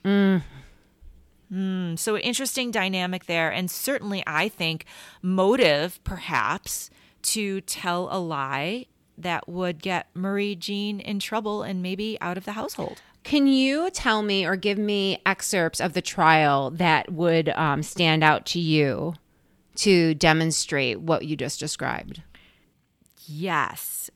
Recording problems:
none

